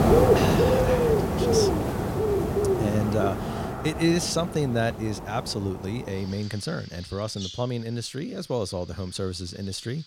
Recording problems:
animal sounds; very loud; throughout; 5 dB above the speech

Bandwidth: 16.5 kHz